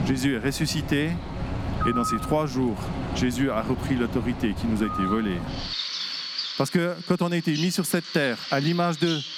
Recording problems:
squashed, flat; somewhat, background pumping
animal sounds; loud; throughout; 6 dB below the speech

